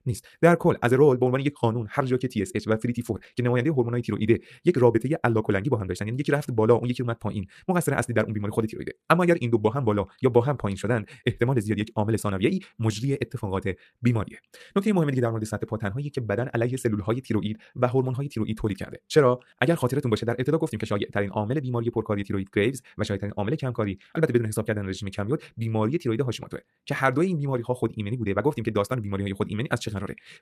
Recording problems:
wrong speed, natural pitch; too fast; 1.8 times normal speed

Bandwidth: 14.5 kHz